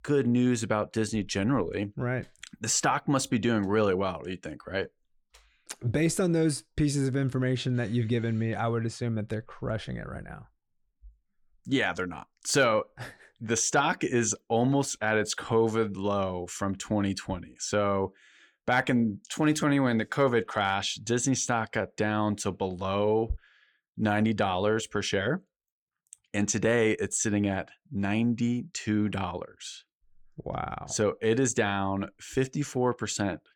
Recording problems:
none

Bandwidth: 17 kHz